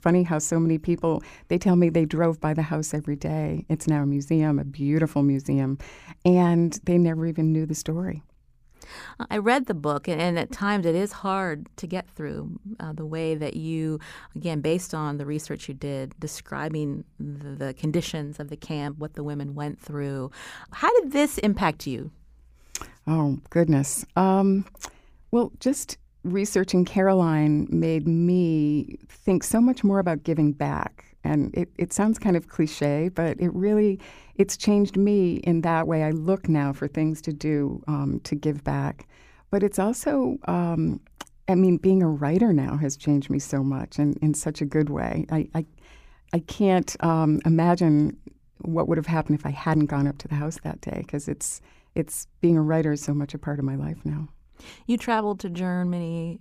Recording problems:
none

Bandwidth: 15 kHz